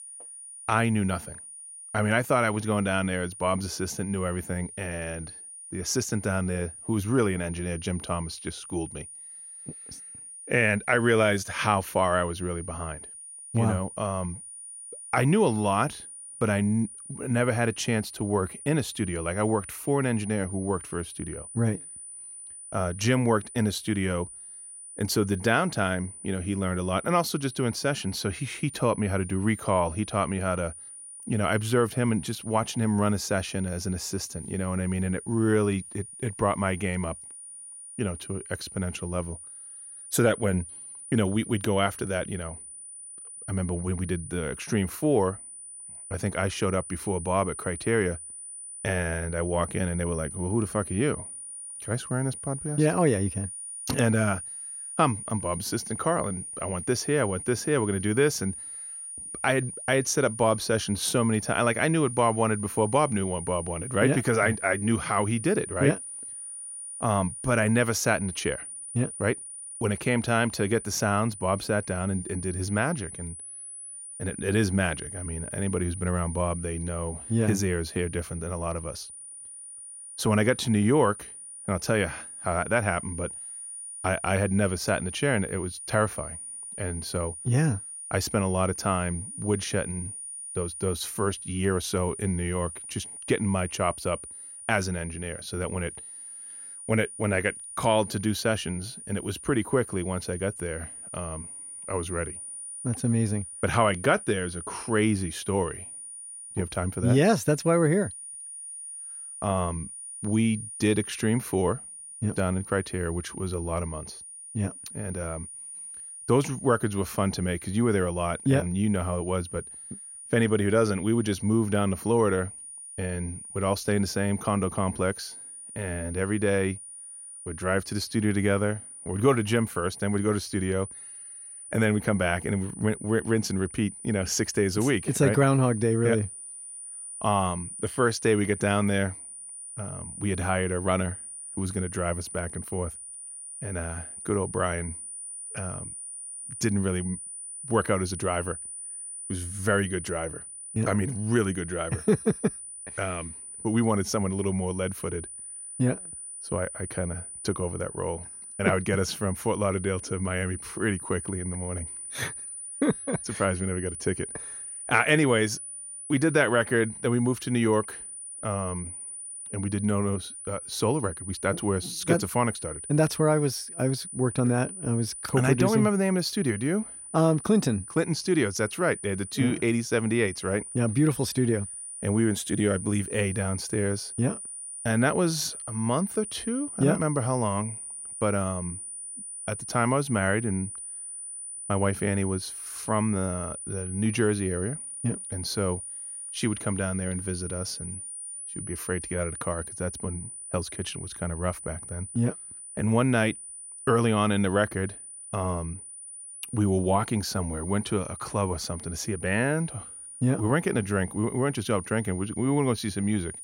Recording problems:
high-pitched whine; noticeable; throughout; 9.5 kHz, 10 dB below the speech

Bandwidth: 16 kHz